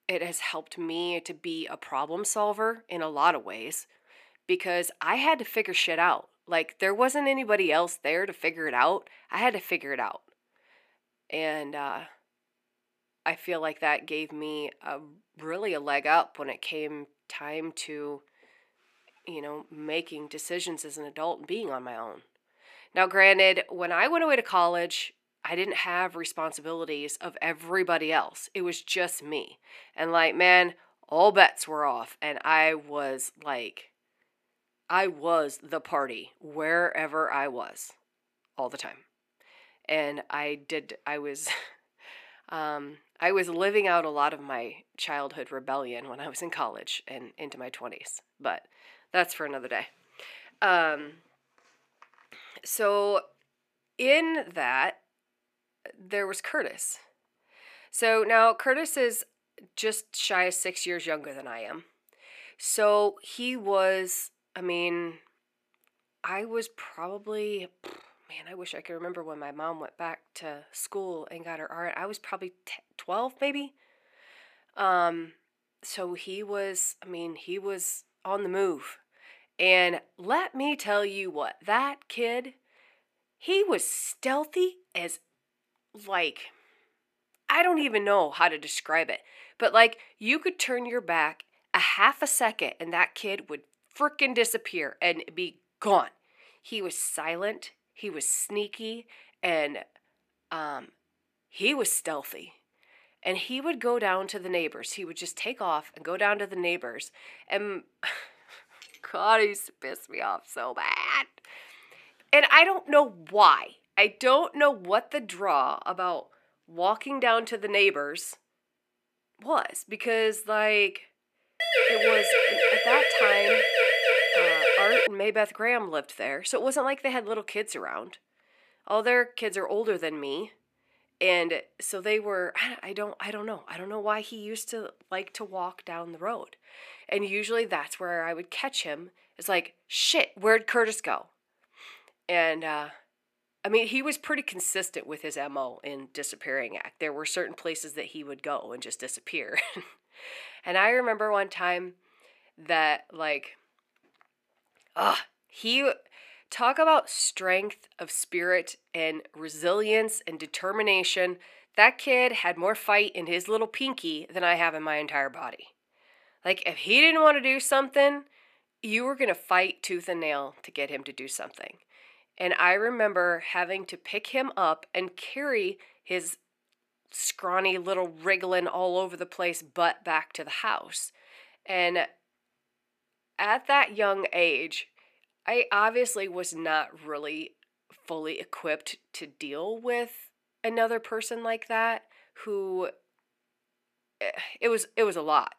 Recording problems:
thin; somewhat; fading below 350 Hz
siren; loud; from 2:02 to 2:05; peak 6 dB above the speech

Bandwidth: 14.5 kHz